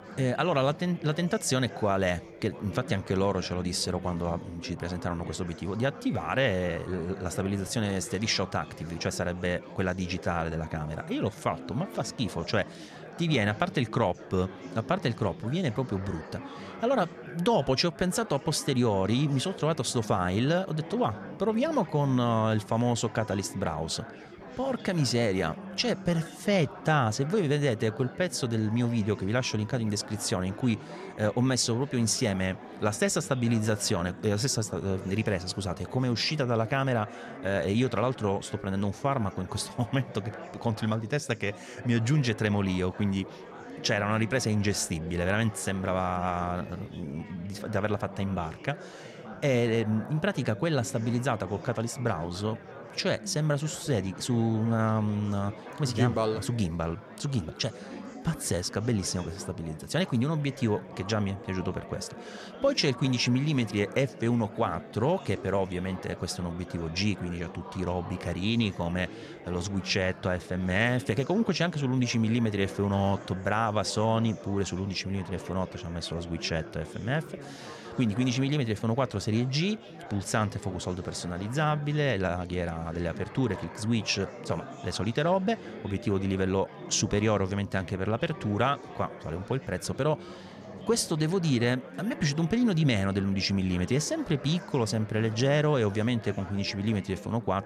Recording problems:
chatter from many people; noticeable; throughout; 15 dB below the speech

